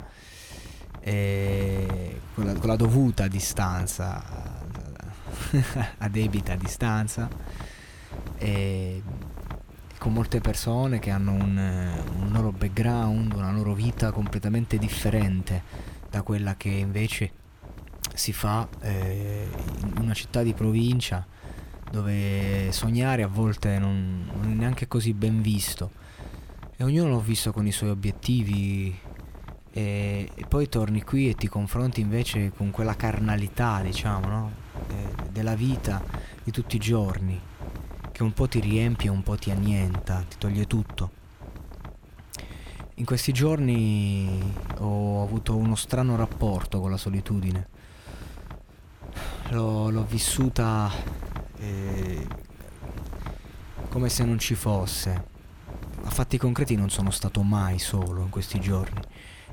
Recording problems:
wind noise on the microphone; occasional gusts; 15 dB below the speech

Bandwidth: 18.5 kHz